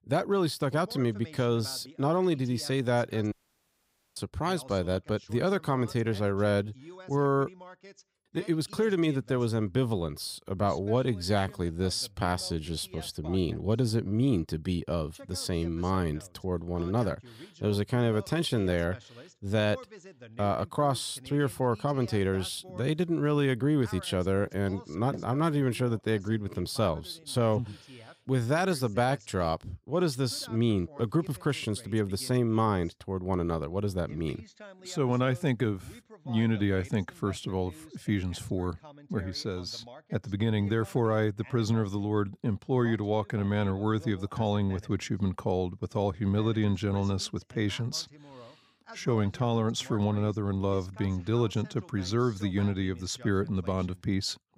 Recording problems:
voice in the background; faint; throughout; 20 dB below the speech
audio cutting out; at 3.5 s for 1 s

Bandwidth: 15.5 kHz